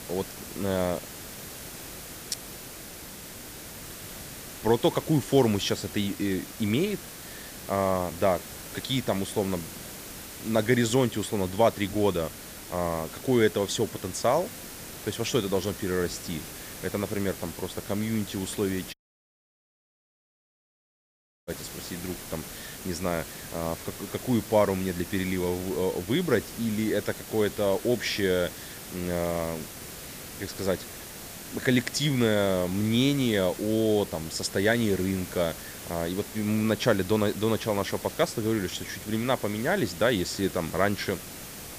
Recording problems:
hiss; noticeable; throughout; 10 dB below the speech
audio cutting out; at 19 s for 2.5 s

